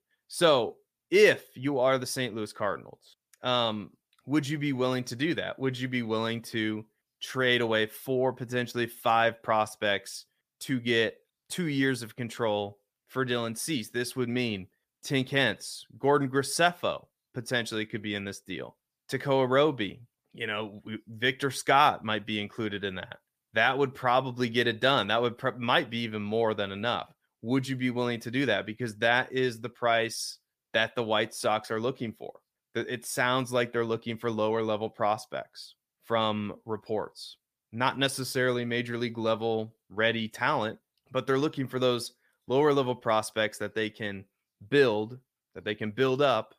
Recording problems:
none

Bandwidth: 15 kHz